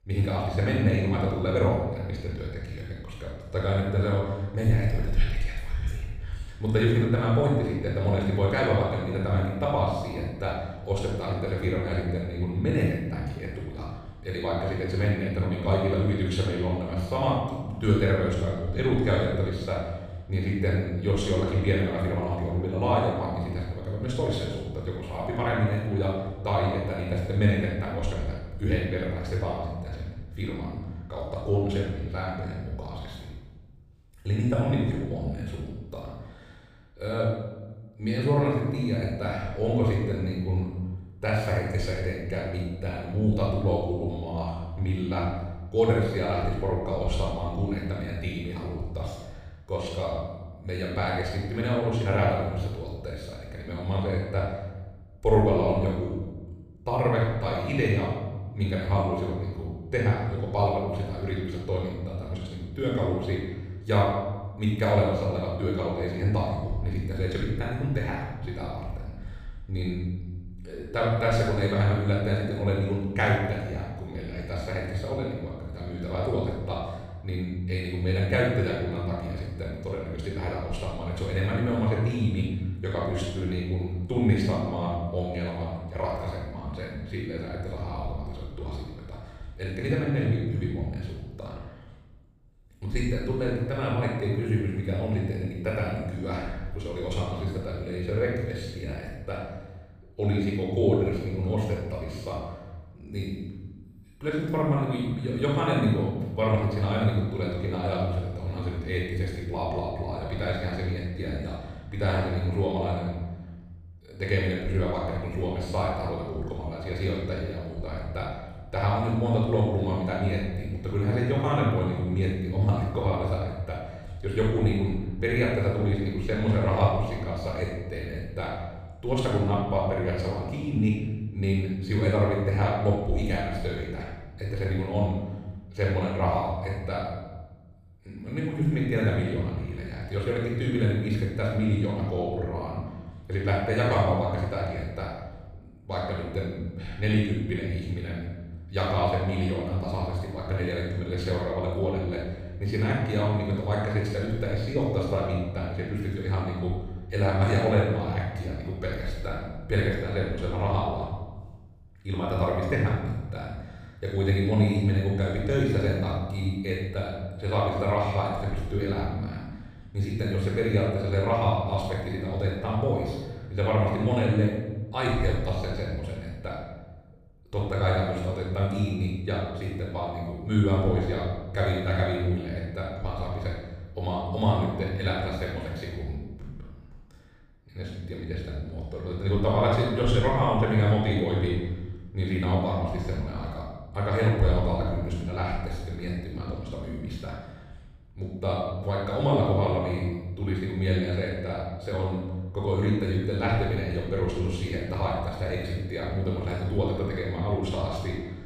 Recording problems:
room echo; strong; dies away in 1.2 s
off-mic speech; far

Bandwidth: 15 kHz